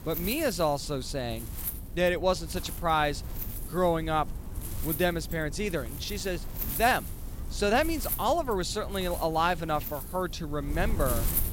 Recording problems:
wind noise on the microphone; occasional gusts; 15 dB below the speech

